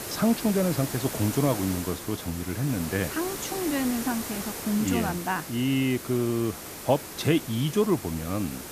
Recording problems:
hiss; loud; throughout; 7 dB below the speech

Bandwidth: 14.5 kHz